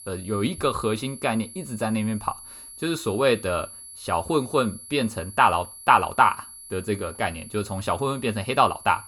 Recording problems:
high-pitched whine; noticeable; throughout; 11 kHz, 15 dB below the speech

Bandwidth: 17.5 kHz